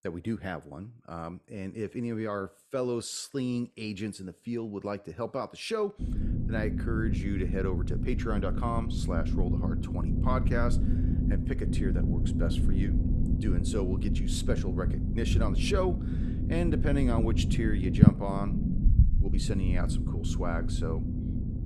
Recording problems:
low rumble; loud; from 6 s on; 3 dB below the speech

